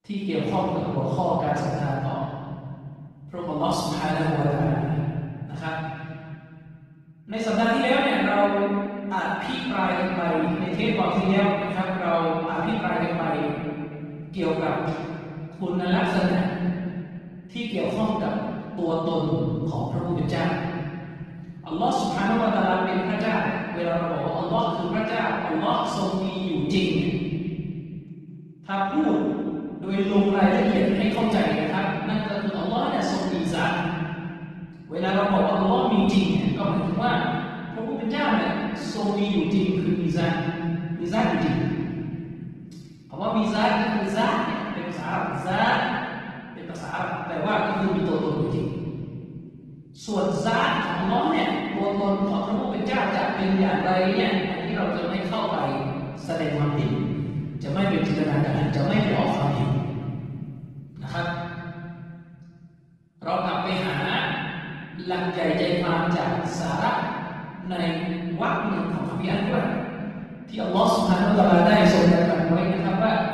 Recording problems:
room echo; strong; dies away in 2.4 s
off-mic speech; far
garbled, watery; slightly

